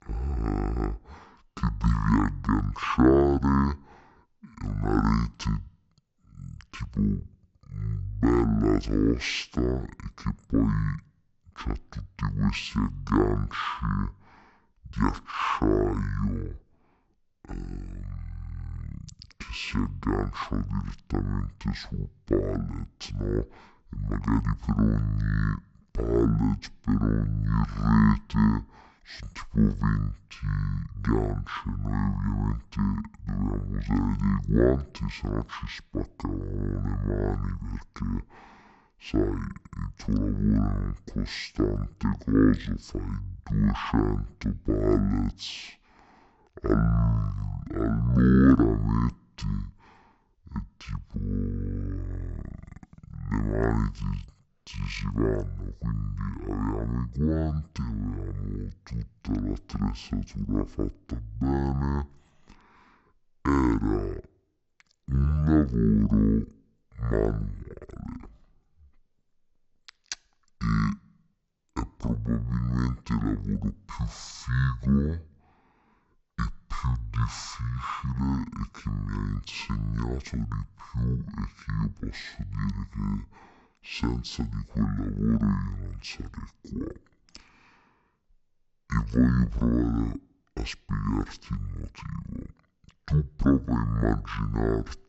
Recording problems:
wrong speed and pitch; too slow and too low; 0.5 times normal speed

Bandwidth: 8 kHz